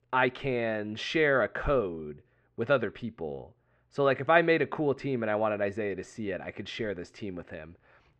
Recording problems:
muffled; very; fading above 2 kHz

